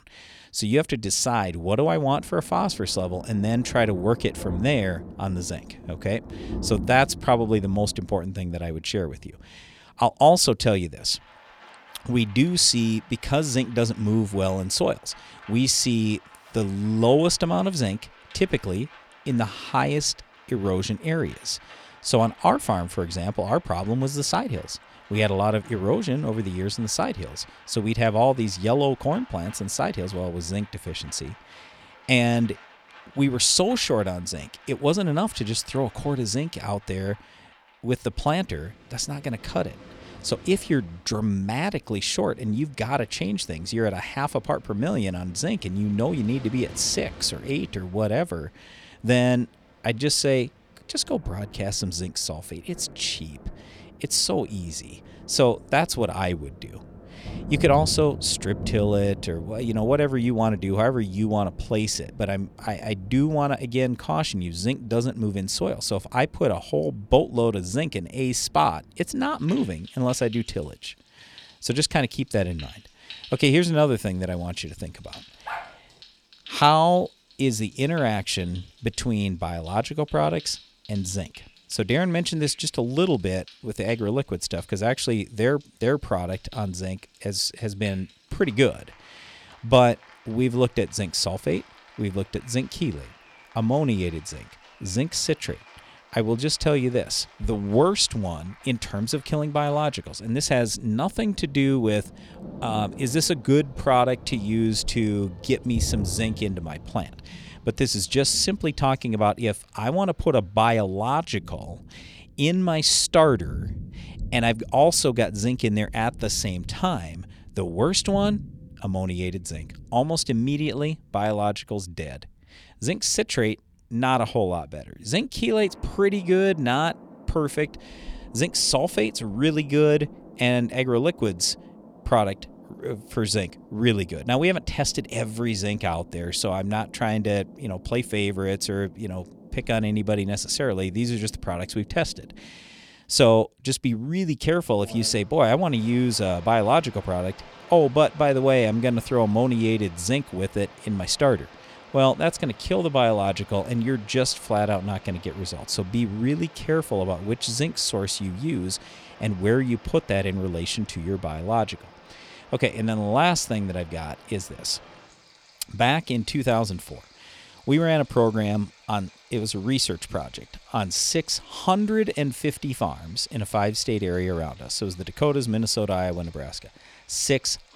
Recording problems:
rain or running water; noticeable; throughout; 20 dB below the speech
dog barking; faint; at 1:15; peak 10 dB below the speech

